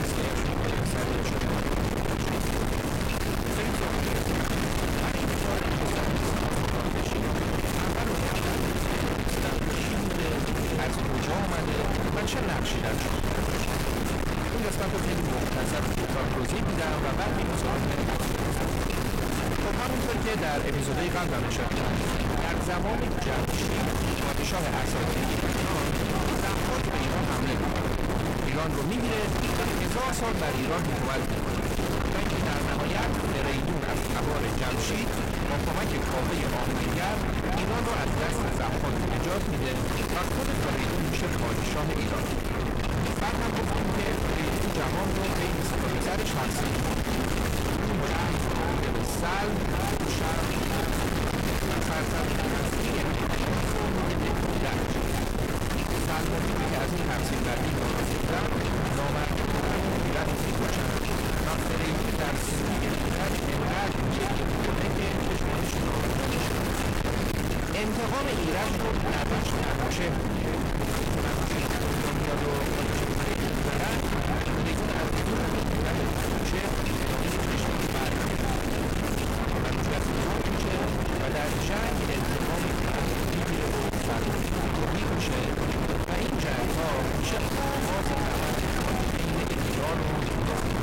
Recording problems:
distortion; heavy; 6 dB below the speech
echo of what is said; noticeable; throughout; 480 ms later, 15 dB below the speech
wind noise on the microphone; heavy; as loud as the speech
chatter from many people; noticeable; throughout; 20 dB below the speech

